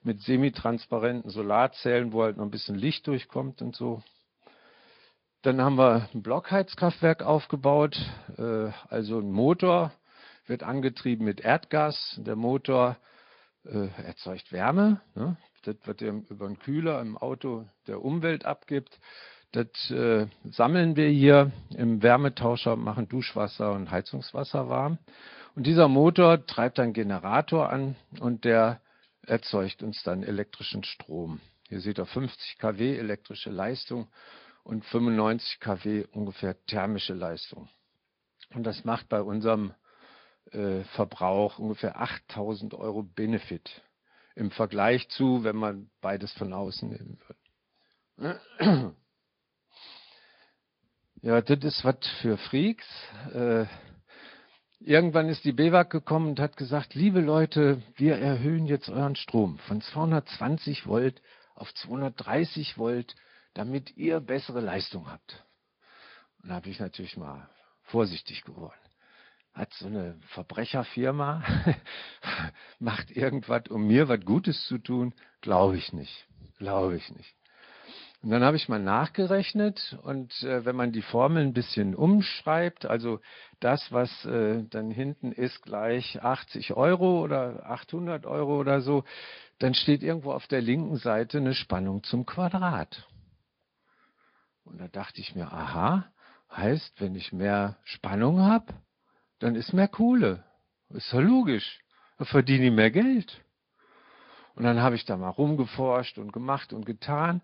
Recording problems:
high frequencies cut off; noticeable; nothing above 5 kHz
garbled, watery; slightly

